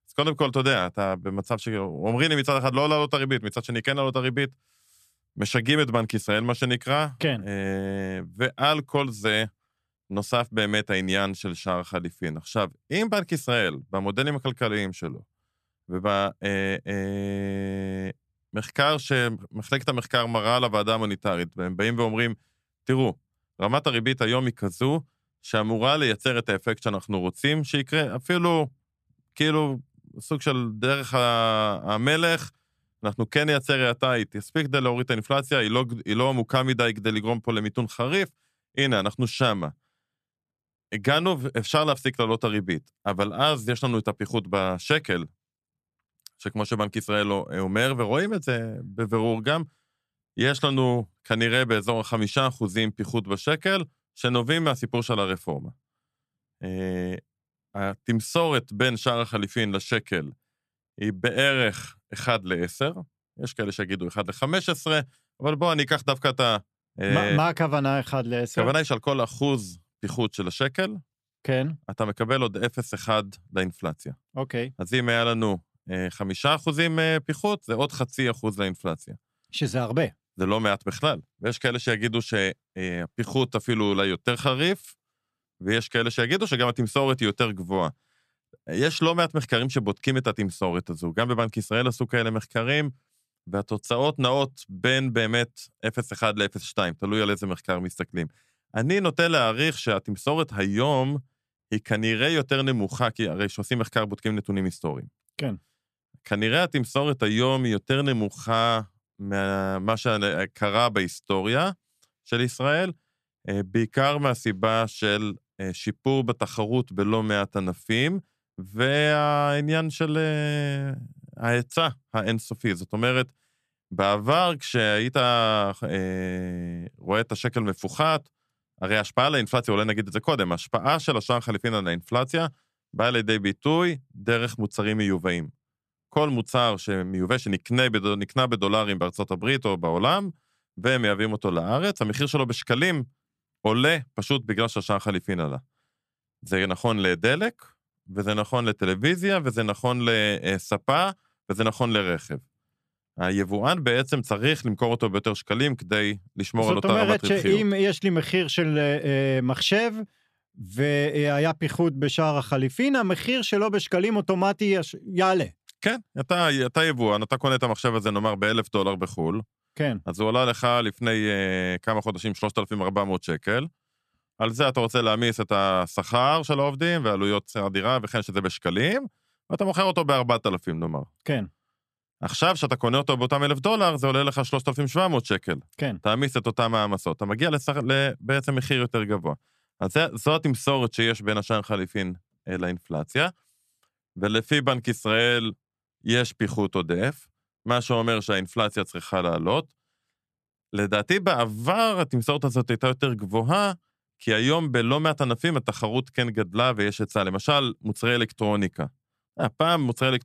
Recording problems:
none

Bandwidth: 14 kHz